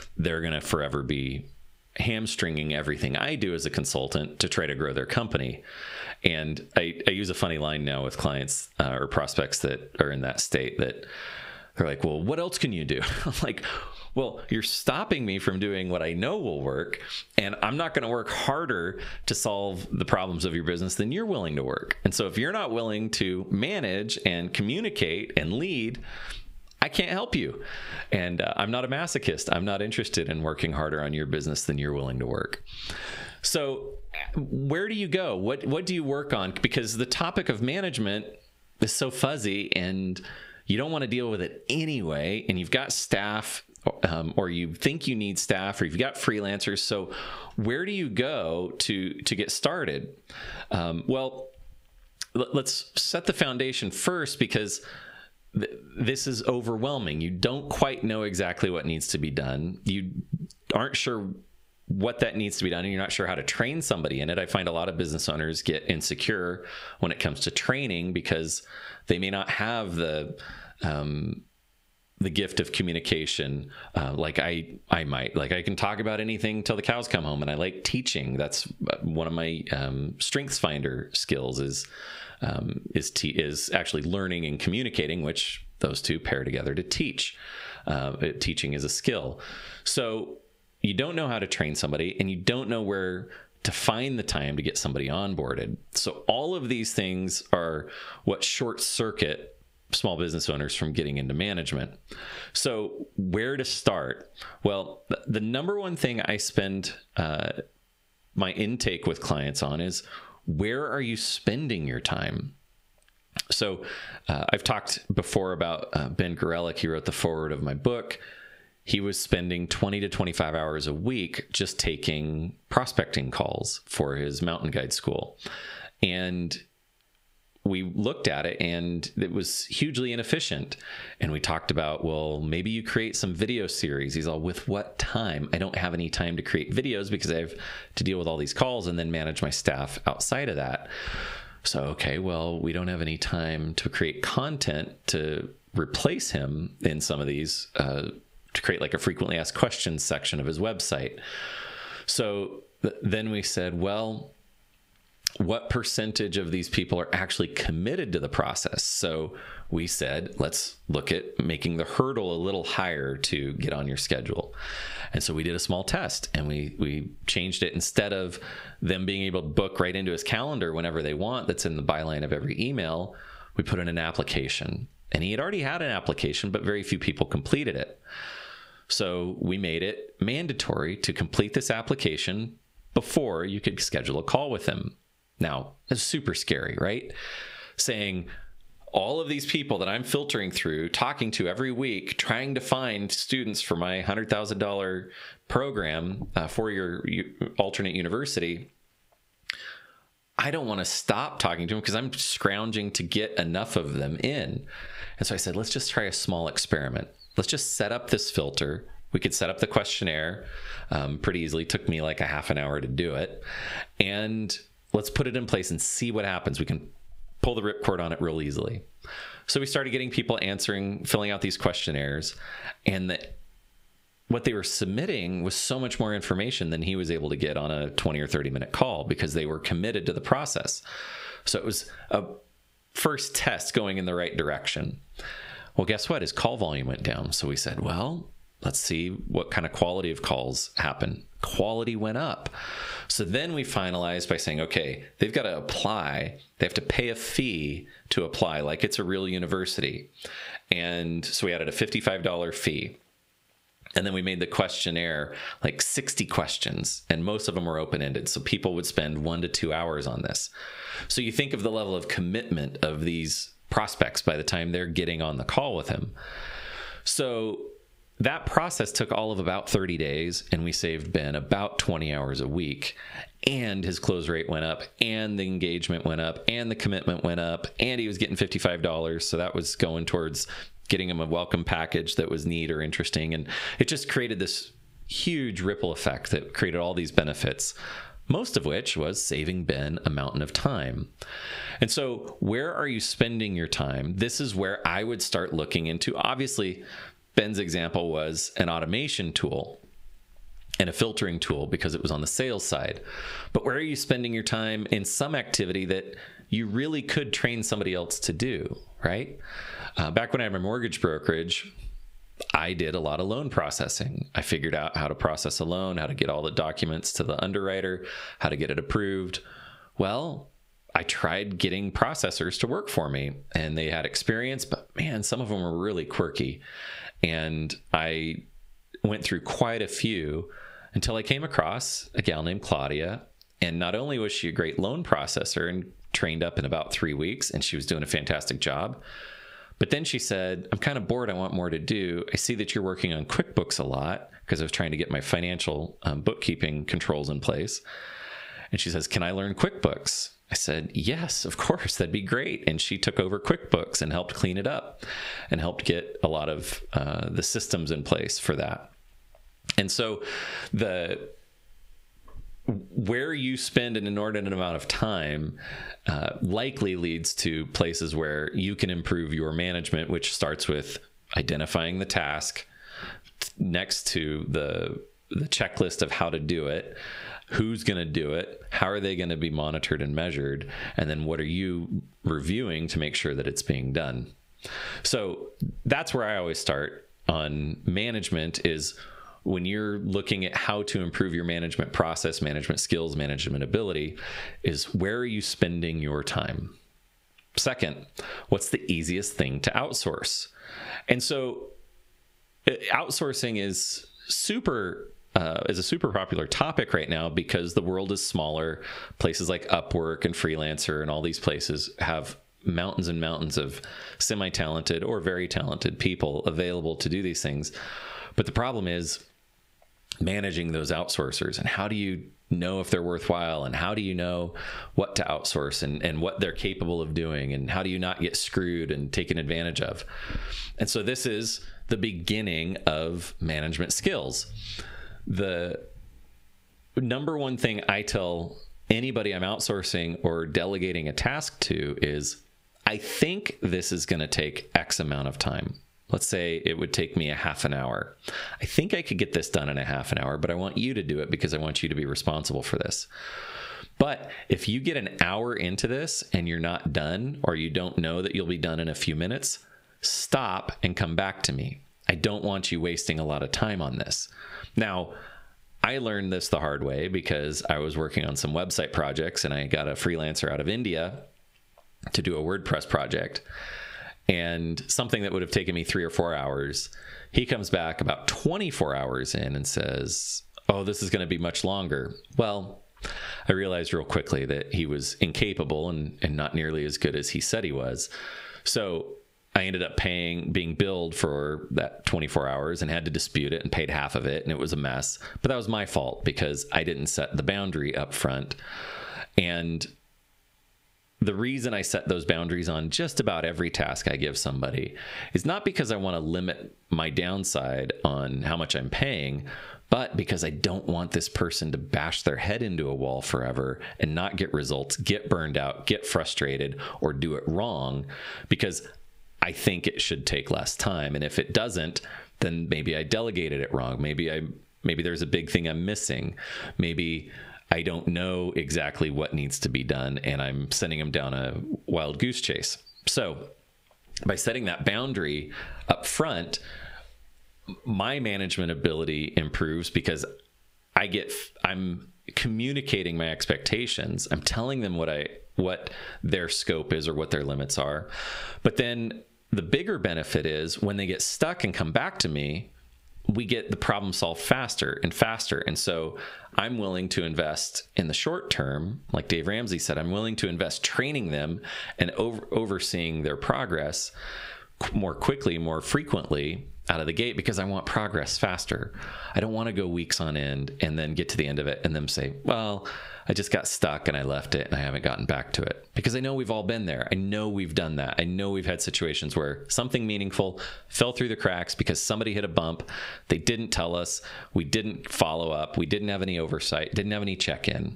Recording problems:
squashed, flat; heavily

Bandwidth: 15.5 kHz